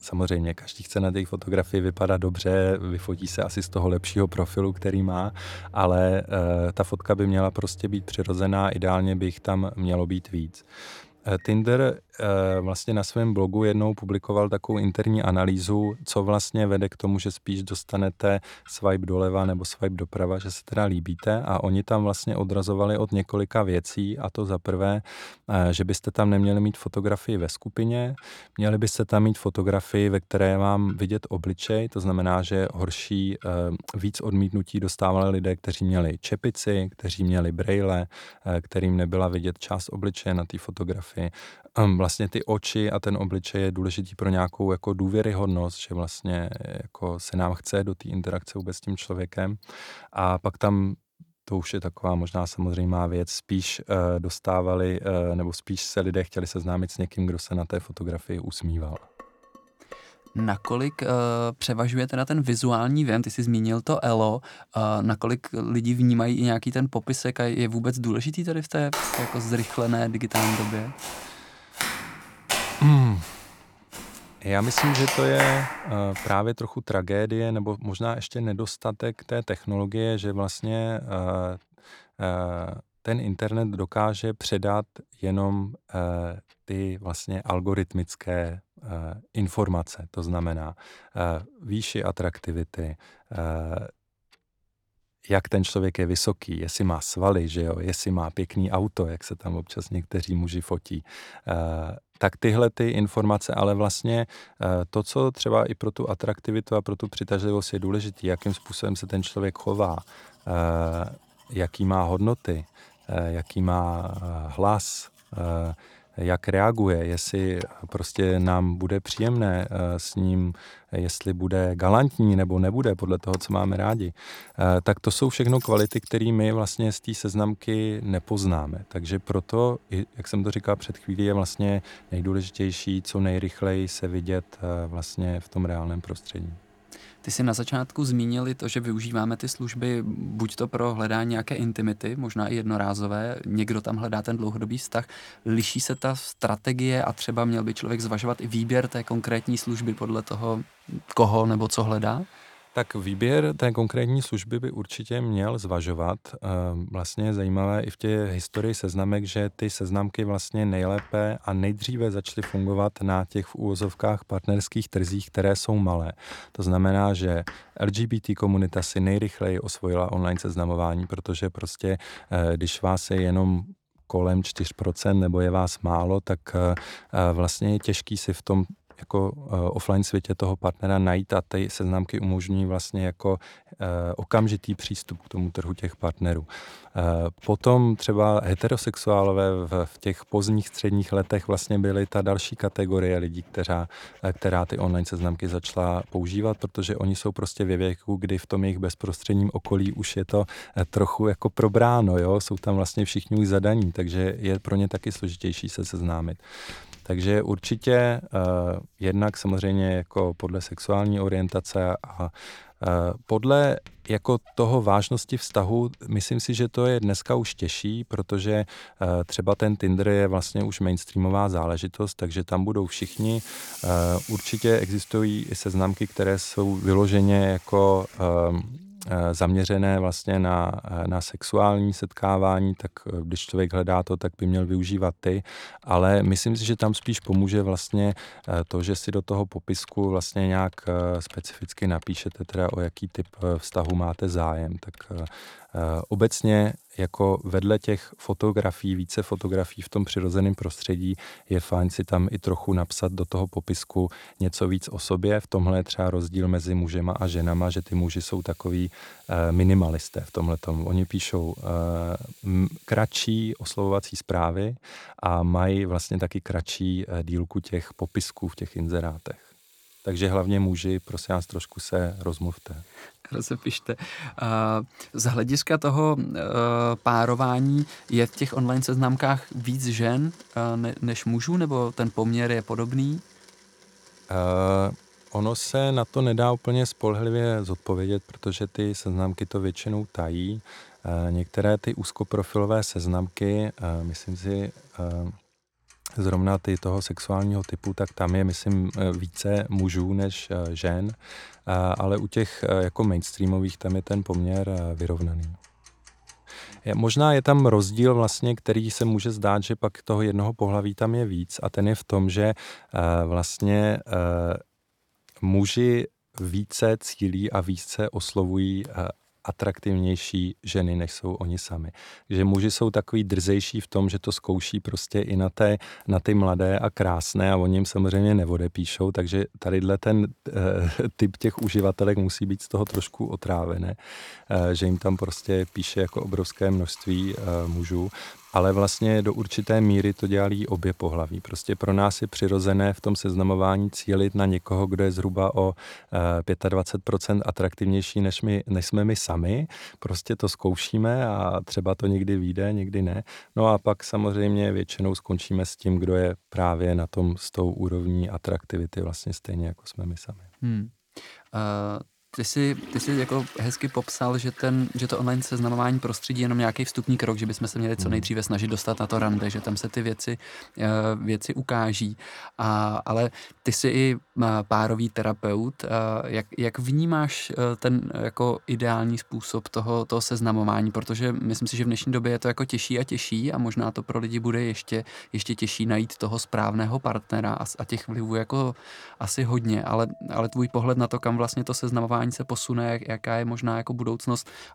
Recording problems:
household noises; faint; throughout; 25 dB below the speech
clattering dishes; faint; from 59 s to 1:01; peak 15 dB below the speech
footsteps; loud; from 1:09 to 1:16; peak 2 dB above the speech

